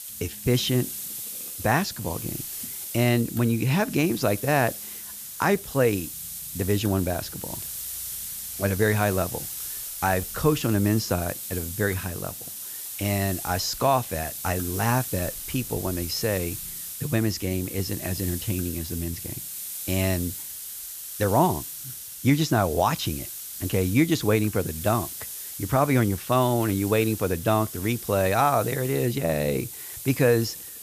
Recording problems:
high frequencies cut off; noticeable; nothing above 8 kHz
hiss; loud; throughout; 8 dB below the speech

